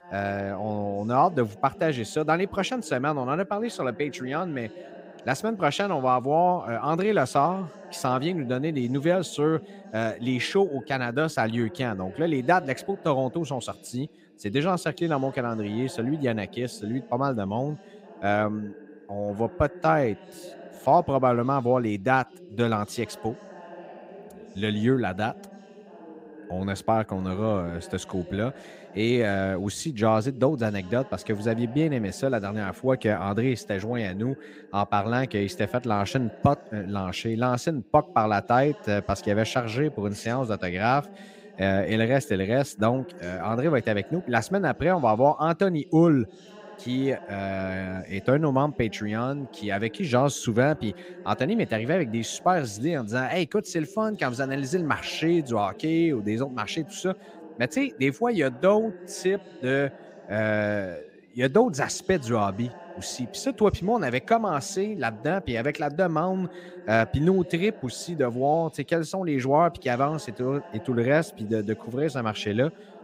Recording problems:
voice in the background; noticeable; throughout; 20 dB below the speech

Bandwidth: 15.5 kHz